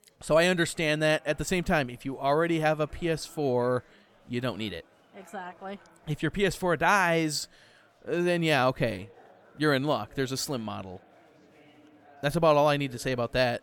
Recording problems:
chatter from many people; faint; throughout; 30 dB below the speech

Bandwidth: 17 kHz